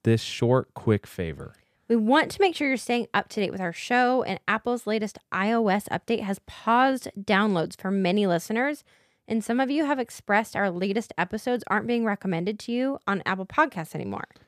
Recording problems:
none

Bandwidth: 14.5 kHz